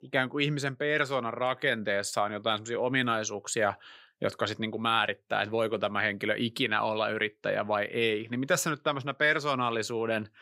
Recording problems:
none

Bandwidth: 15.5 kHz